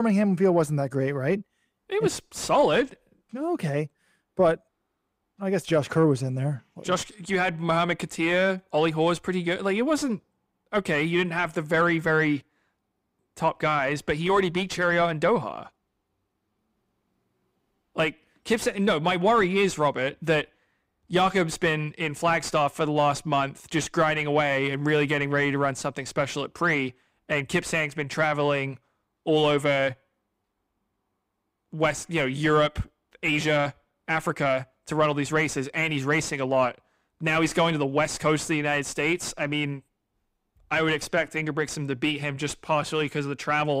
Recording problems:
distortion; slight; 10 dB below the speech
abrupt cut into speech; at the start and the end

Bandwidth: 15.5 kHz